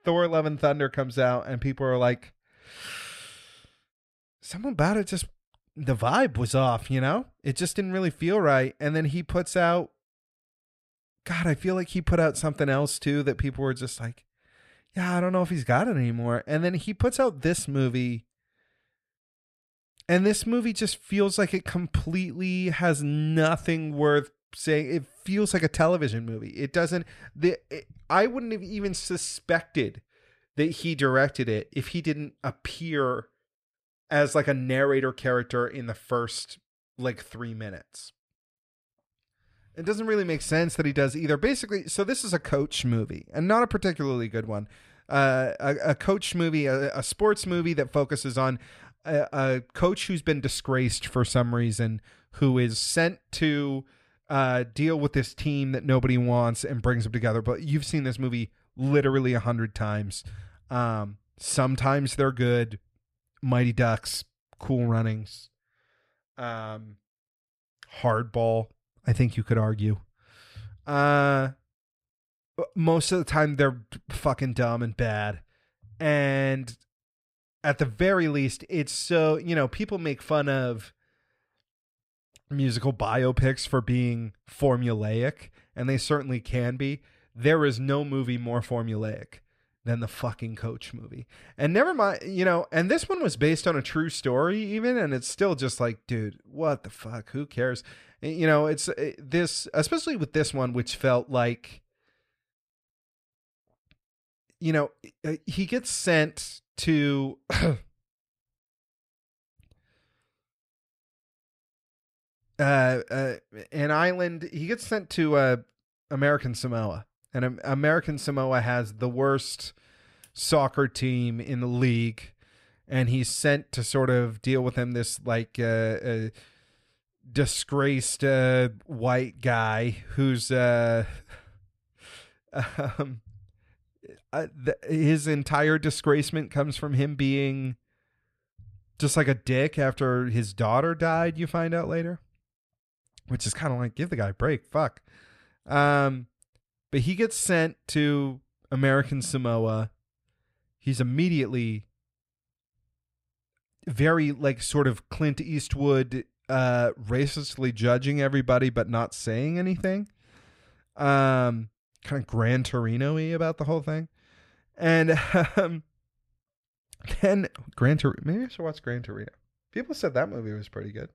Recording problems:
none

